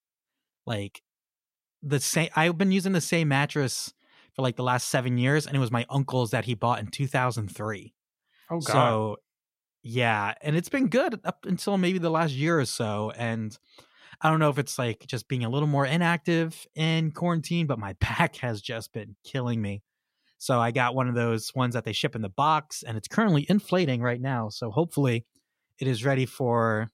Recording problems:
none

